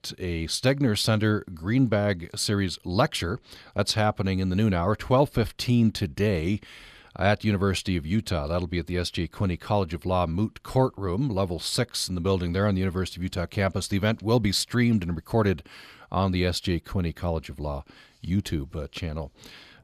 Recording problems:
none

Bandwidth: 14.5 kHz